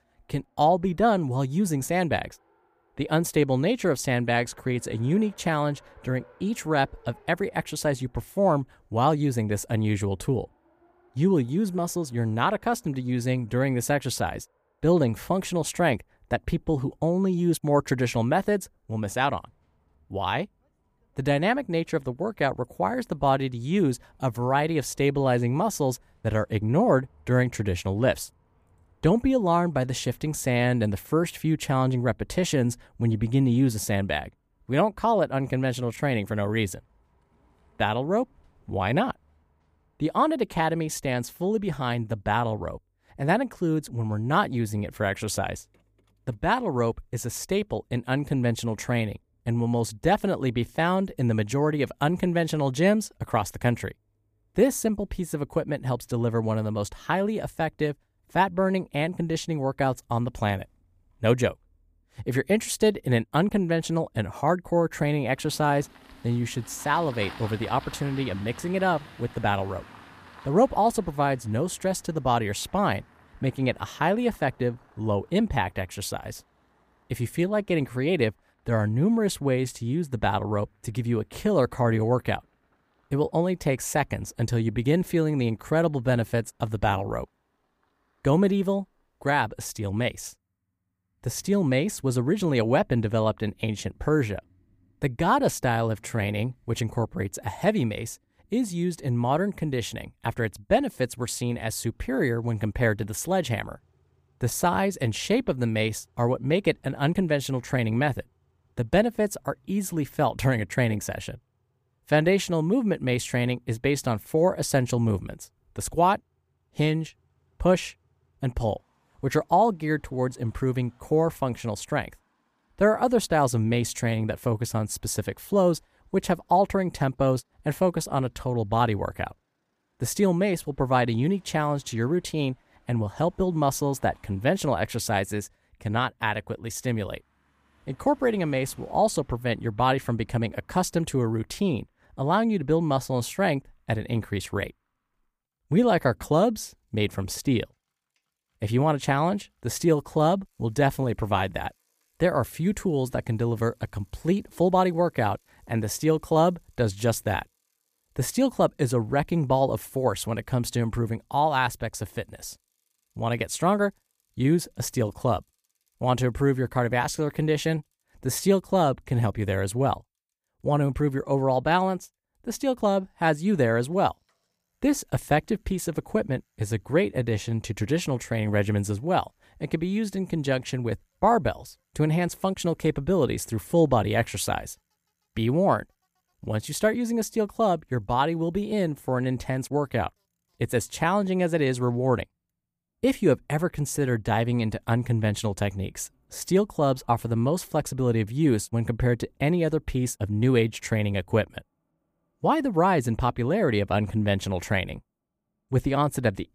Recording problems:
traffic noise; faint; throughout; 30 dB below the speech

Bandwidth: 15 kHz